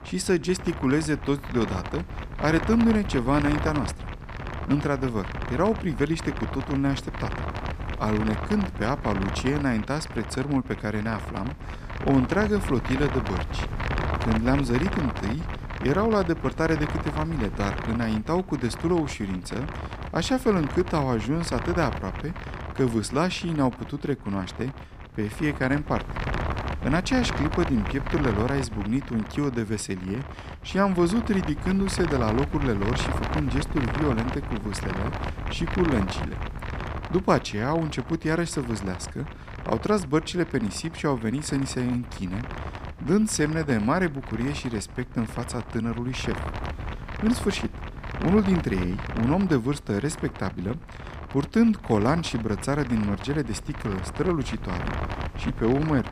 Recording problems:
wind noise on the microphone; heavy; 7 dB below the speech

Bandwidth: 14.5 kHz